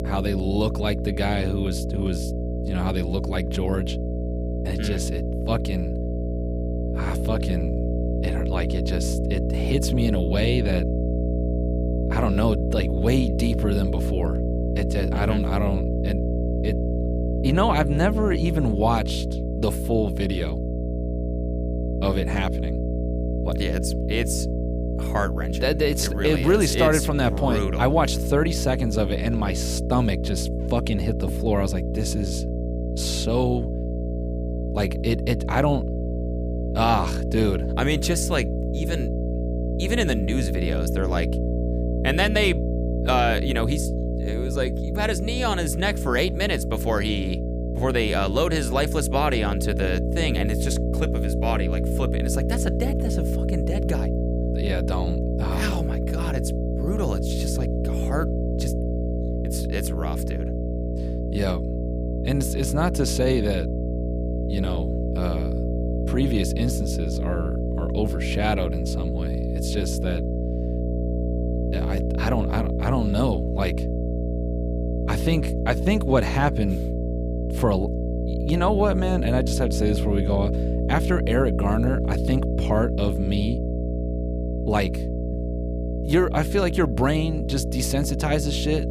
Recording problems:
electrical hum; loud; throughout; 60 Hz, 6 dB below the speech

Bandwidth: 15 kHz